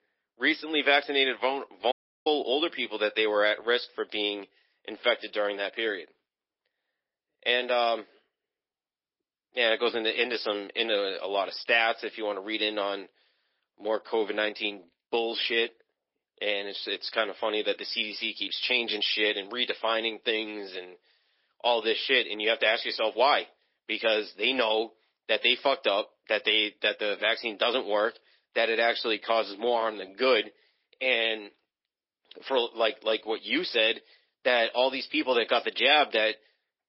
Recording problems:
thin; very; fading below 300 Hz
garbled, watery; slightly; nothing above 5.5 kHz
high frequencies cut off; slight
audio cutting out; at 2 s

